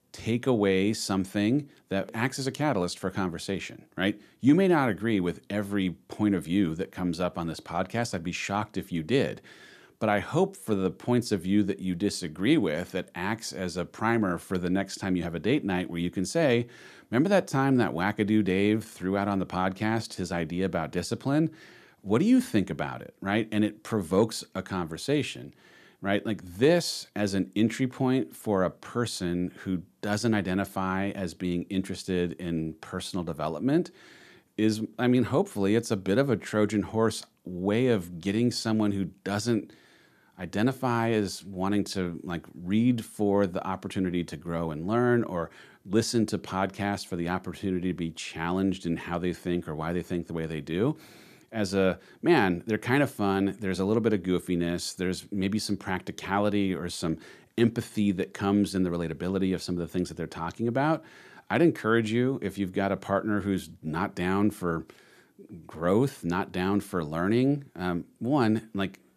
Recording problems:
none

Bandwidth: 14.5 kHz